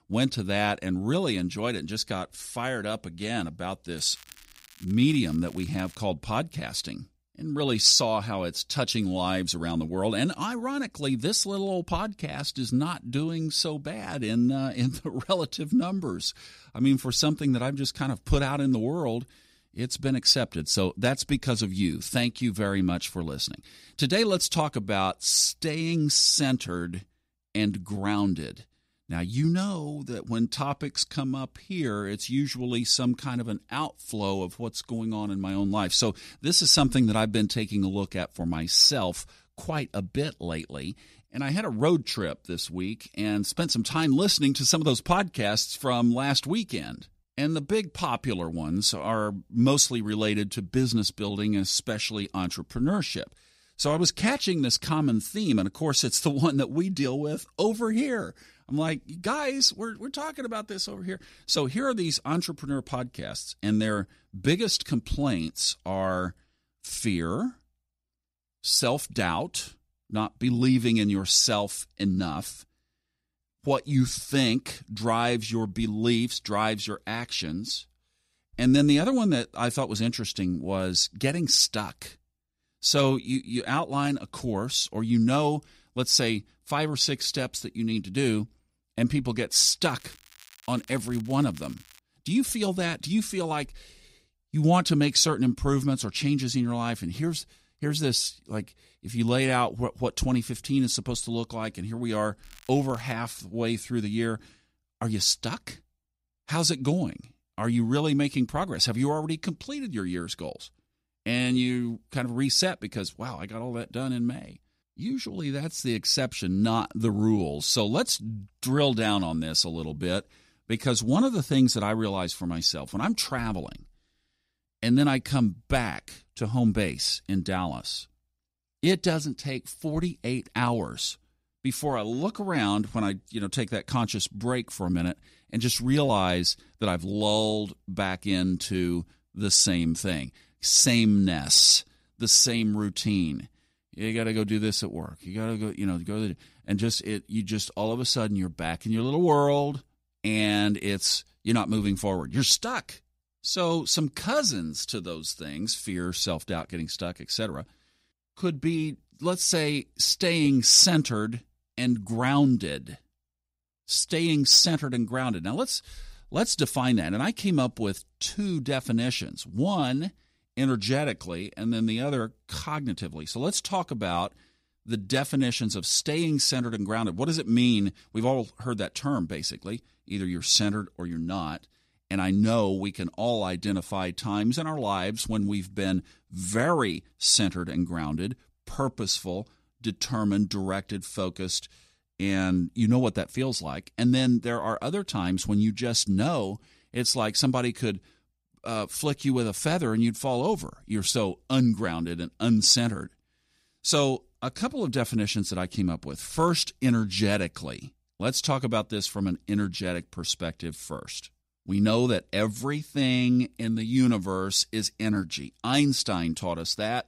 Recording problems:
crackling; faint; 4 times, first at 4 s; 25 dB below the speech

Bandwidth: 15.5 kHz